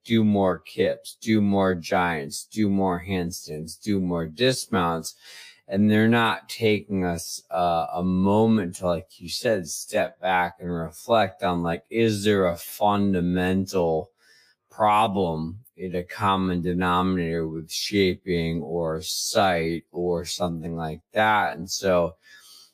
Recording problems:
wrong speed, natural pitch; too slow; 0.5 times normal speed

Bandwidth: 15 kHz